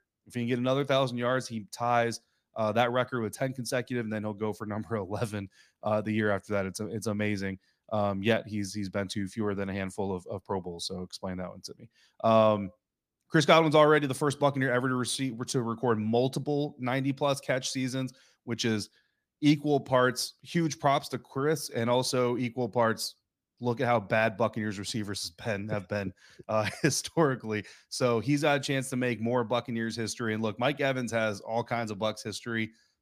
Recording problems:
none

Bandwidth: 15 kHz